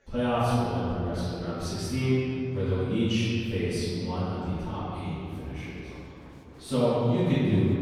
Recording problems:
room echo; strong; dies away in 2.5 s
off-mic speech; far
murmuring crowd; faint; throughout; 25 dB below the speech

